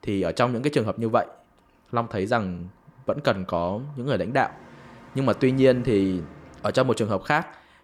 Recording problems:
traffic noise; faint; throughout; 25 dB below the speech

